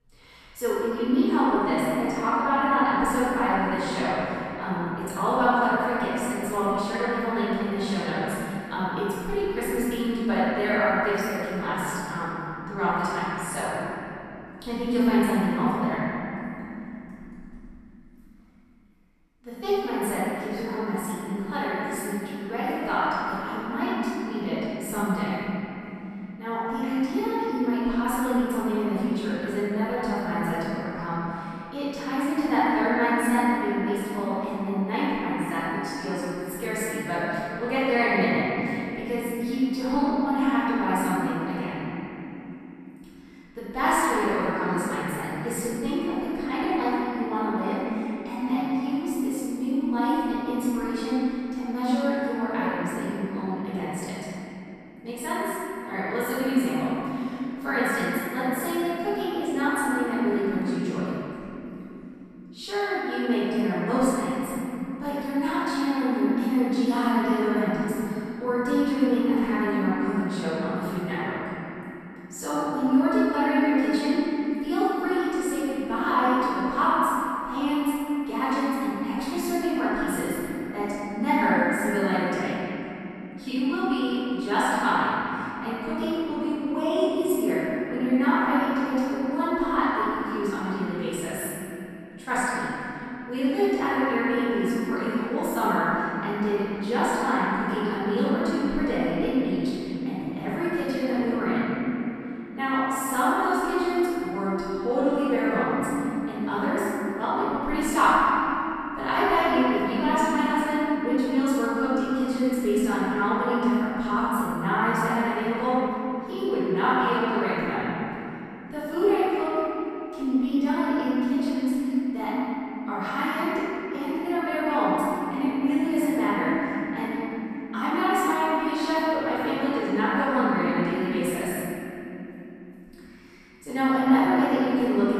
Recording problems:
room echo; strong; dies away in 3 s
off-mic speech; far

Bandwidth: 14 kHz